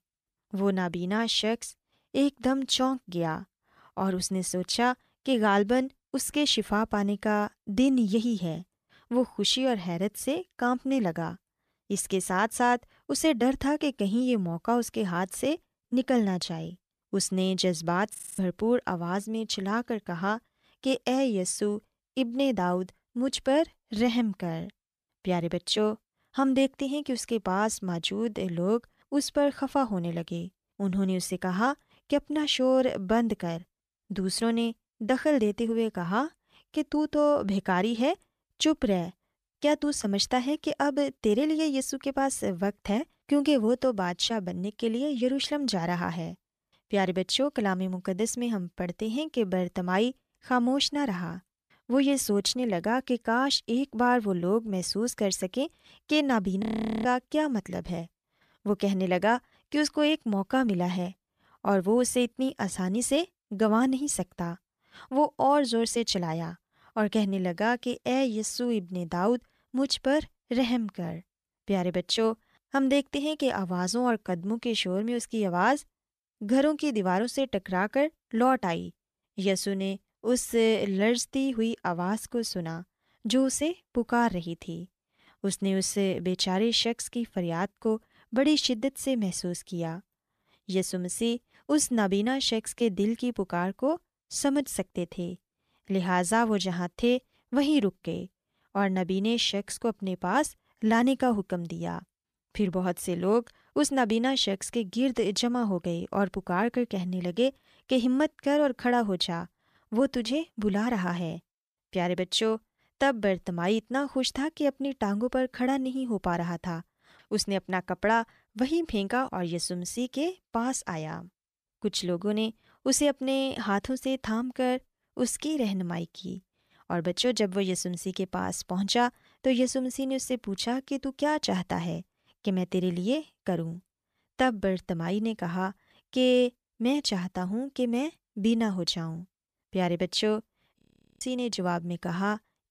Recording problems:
audio freezing; at 18 s, at 57 s and at 2:21

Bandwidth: 14.5 kHz